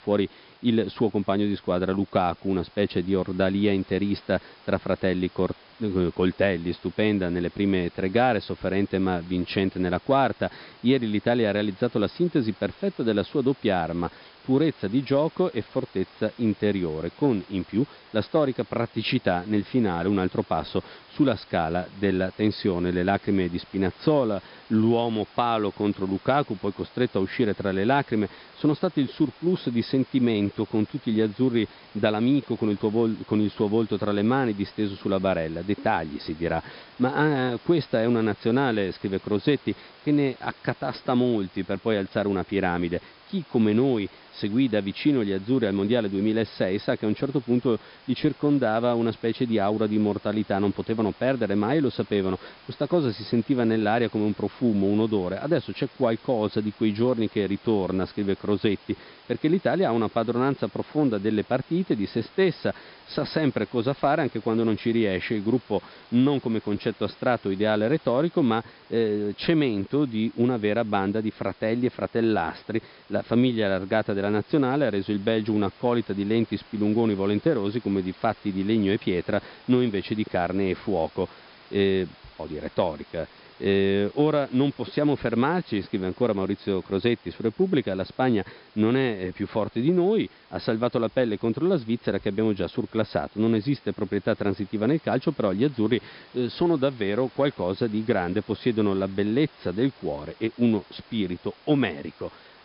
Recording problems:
high frequencies cut off; noticeable; nothing above 5.5 kHz
hiss; faint; throughout; 25 dB below the speech

